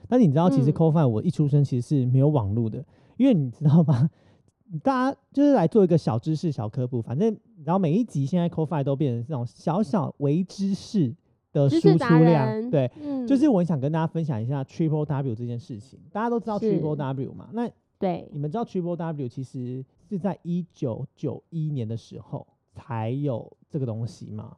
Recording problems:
muffled; very; fading above 1.5 kHz

